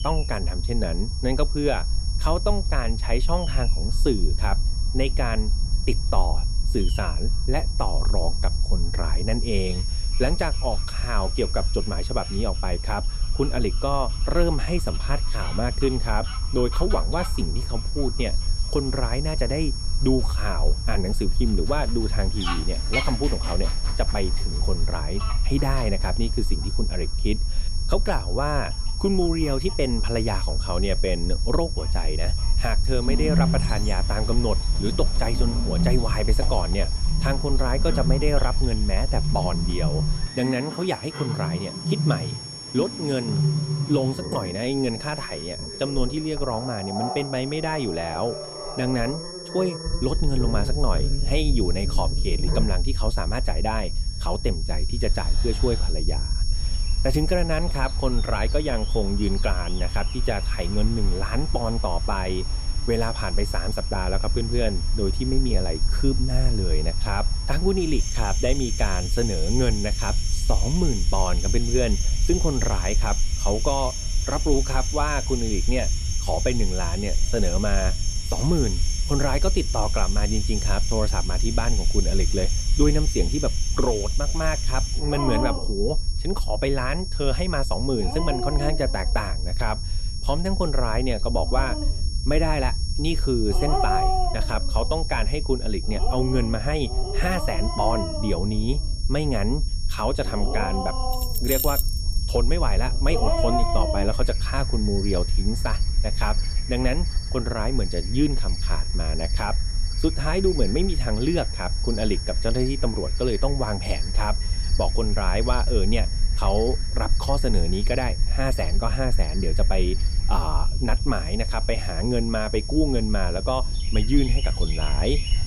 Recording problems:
high-pitched whine; loud; throughout; 5.5 kHz, 7 dB below the speech
animal sounds; loud; throughout; 5 dB below the speech
low rumble; noticeable; until 40 s and from 50 s on; 20 dB below the speech
jangling keys; loud; at 1:41; peak 3 dB above the speech

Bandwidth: 15 kHz